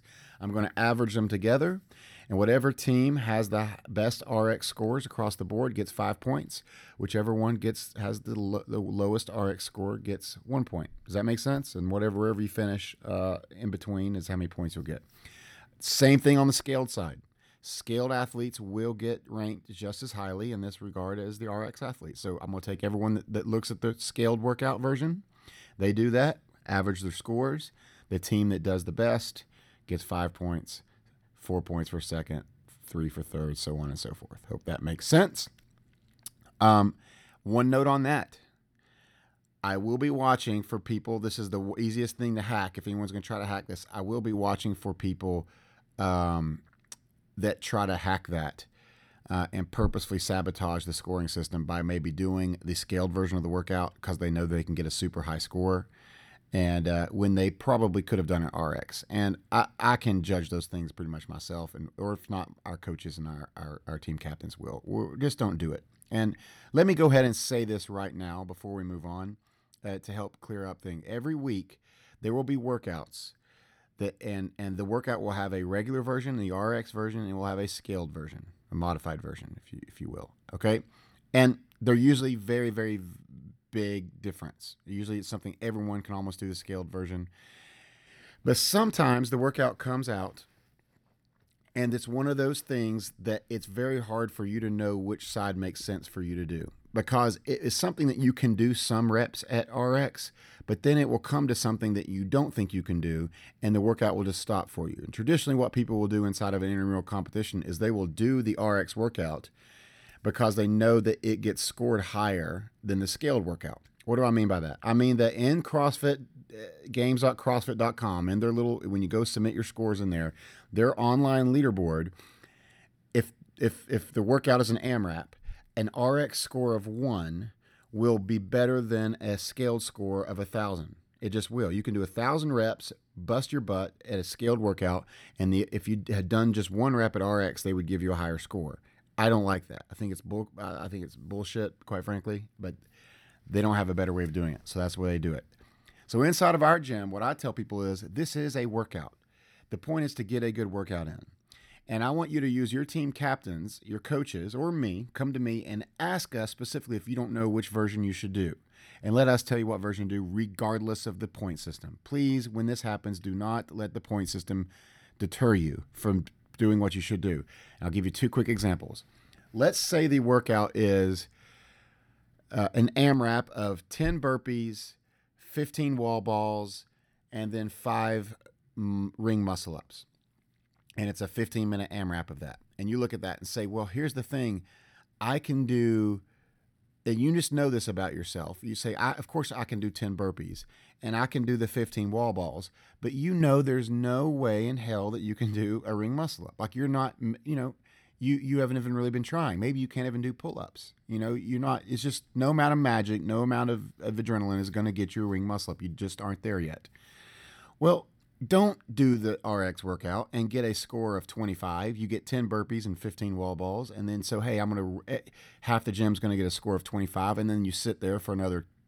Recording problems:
none

